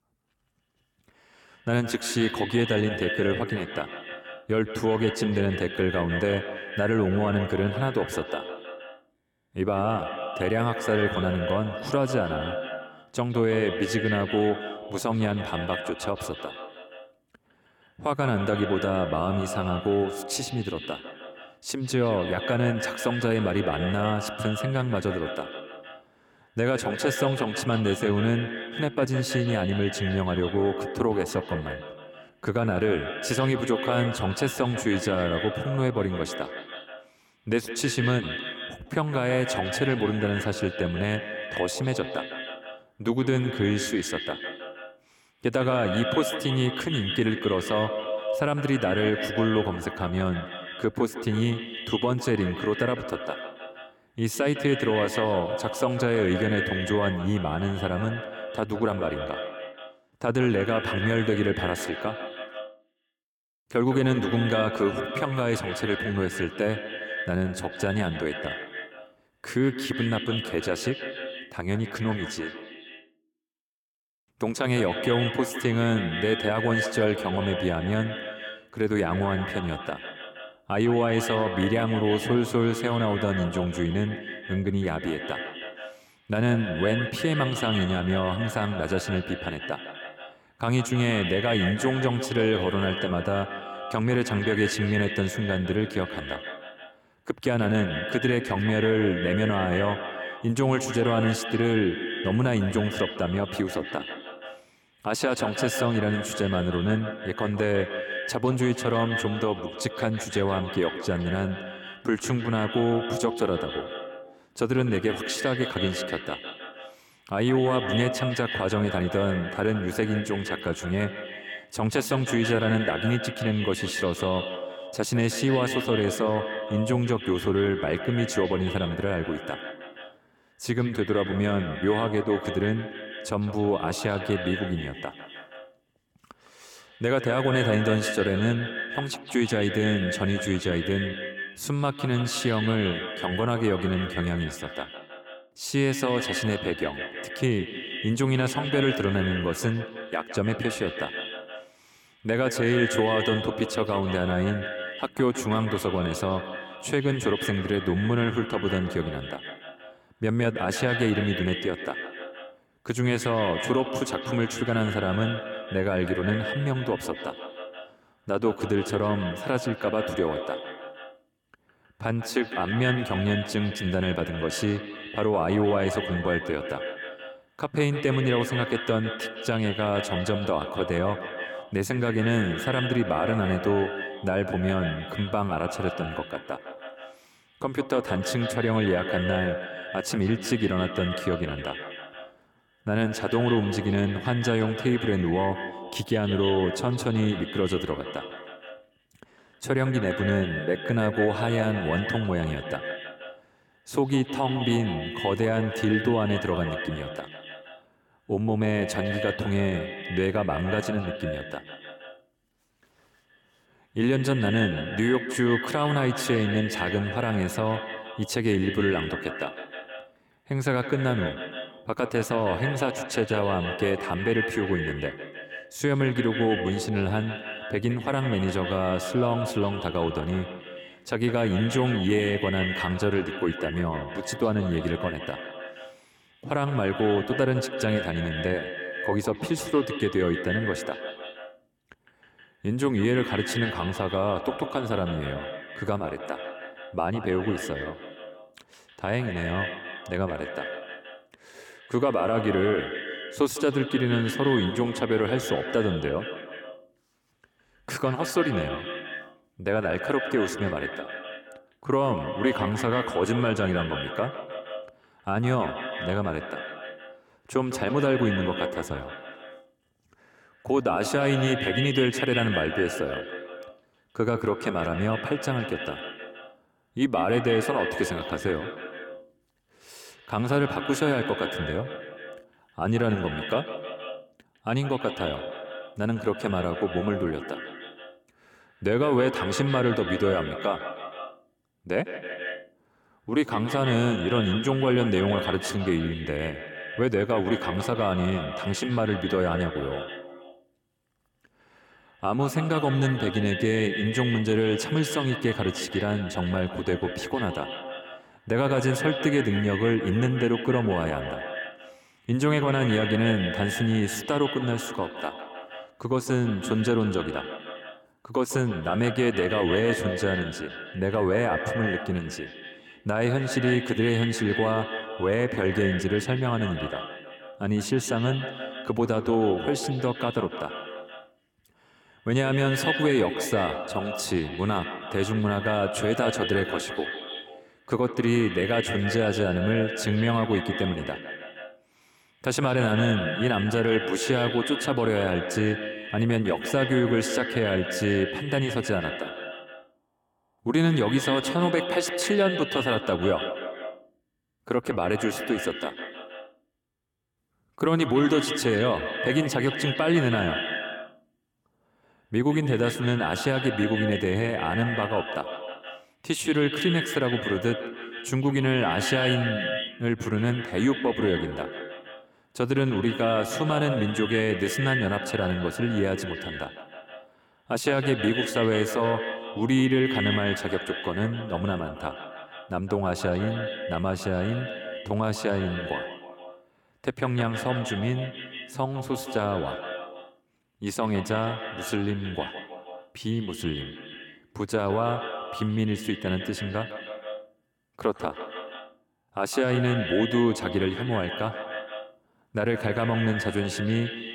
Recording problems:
echo of what is said; strong; throughout; 160 ms later, 7 dB below the speech

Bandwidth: 17.5 kHz